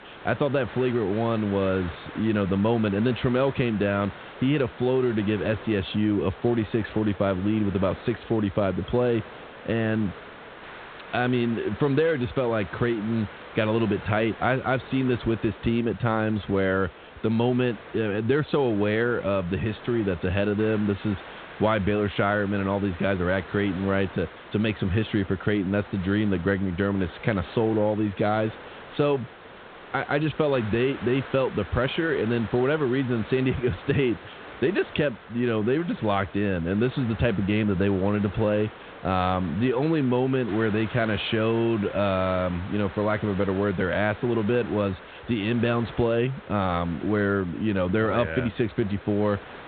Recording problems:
high frequencies cut off; severe; nothing above 4 kHz
hiss; noticeable; throughout; 15 dB below the speech

